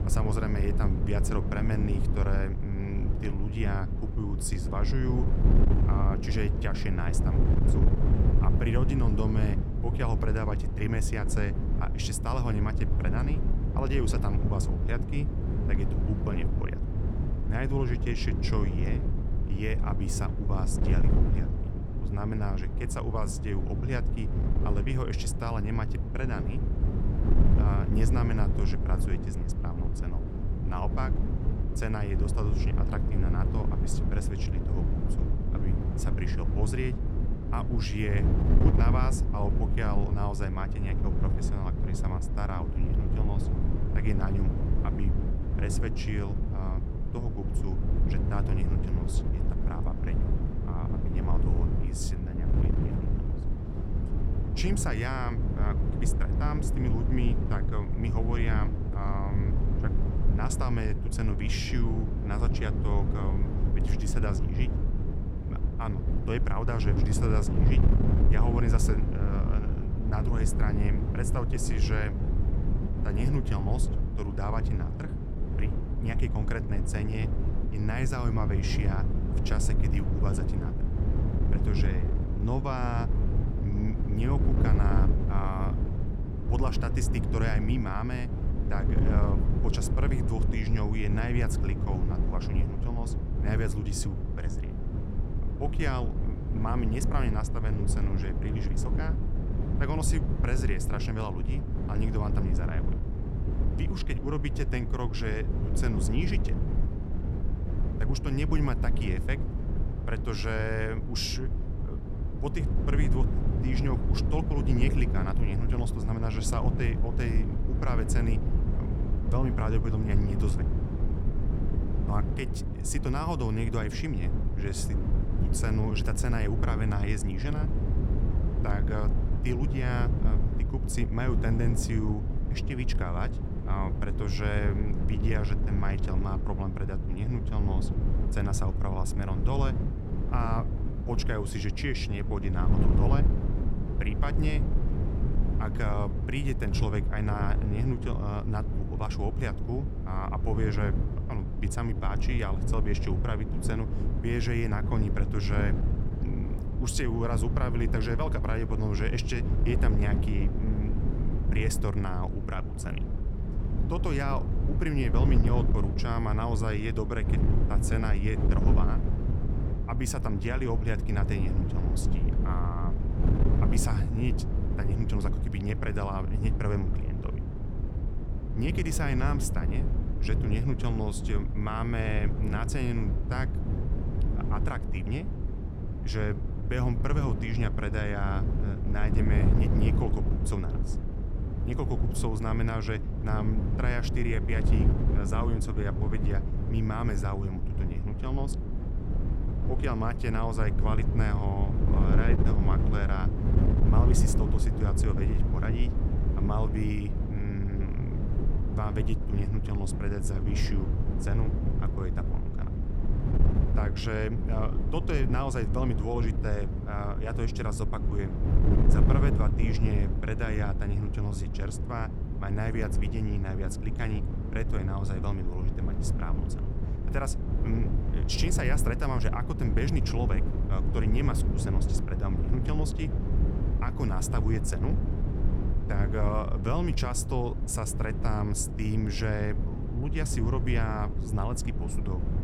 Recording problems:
wind noise on the microphone; heavy; 4 dB below the speech

